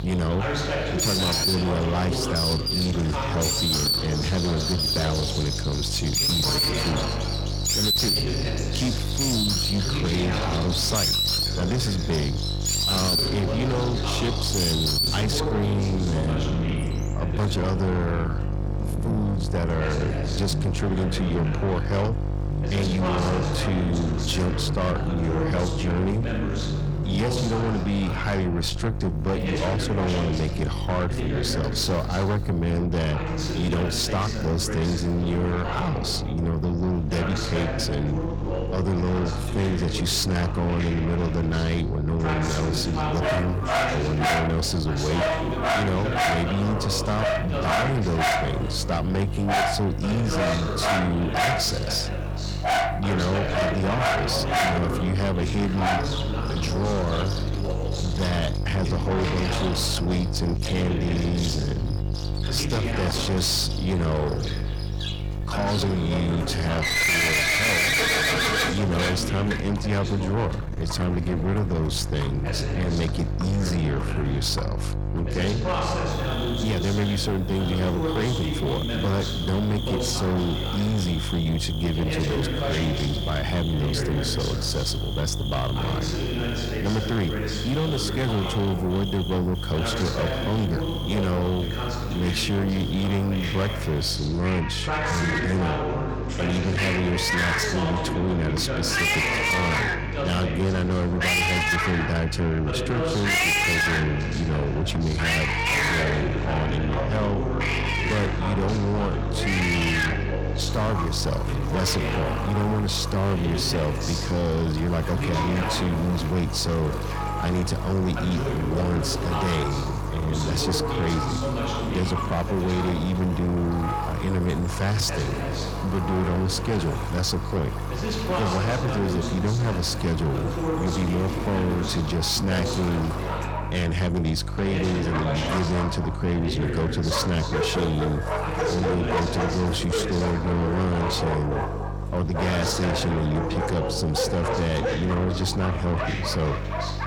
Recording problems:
distortion; heavy; 7 dB below the speech
electrical hum; loud; throughout; 50 Hz, 9 dB below the speech
animal sounds; loud; throughout; 2 dB below the speech
voice in the background; loud; throughout; 5 dB below the speech

